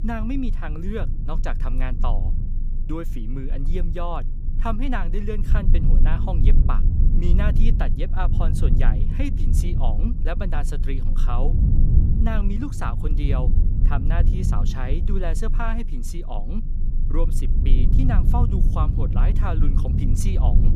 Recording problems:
low rumble; loud; throughout; 6 dB below the speech

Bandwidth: 15 kHz